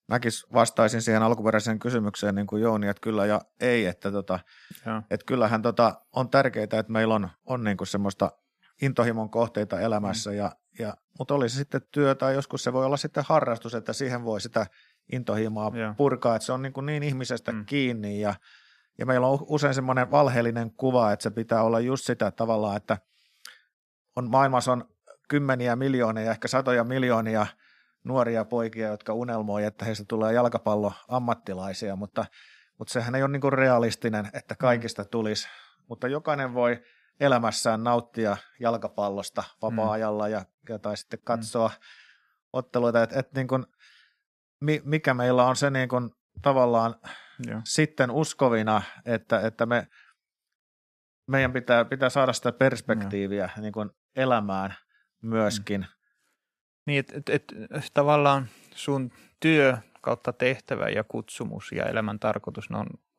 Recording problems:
none

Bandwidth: 14.5 kHz